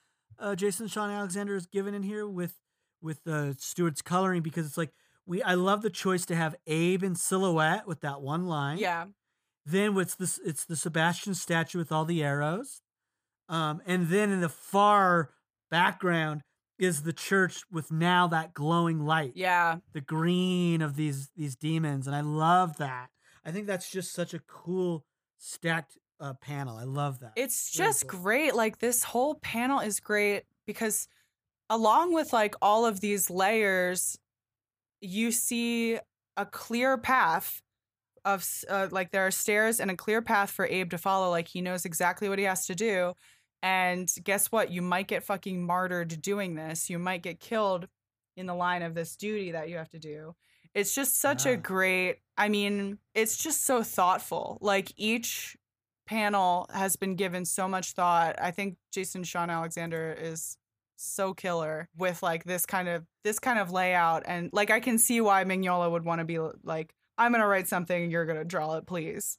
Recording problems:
none

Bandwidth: 15 kHz